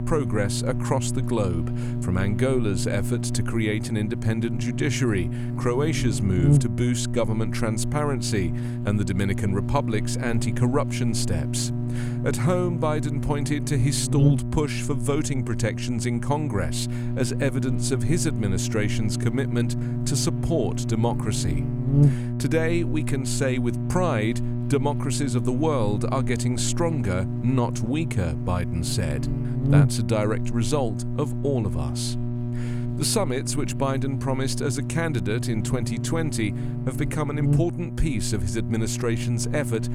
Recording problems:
electrical hum; loud; throughout; 60 Hz, 7 dB below the speech

